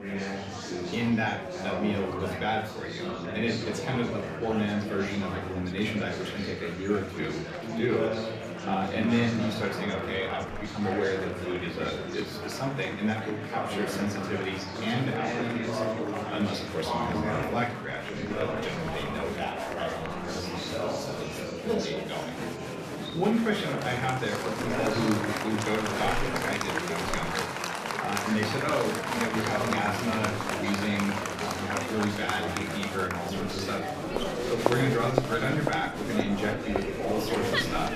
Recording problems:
room echo; slight; dies away in 0.4 s
off-mic speech; somewhat distant
murmuring crowd; loud; throughout; 1 dB below the speech
background music; faint; from 11 s on; 20 dB below the speech

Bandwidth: 14.5 kHz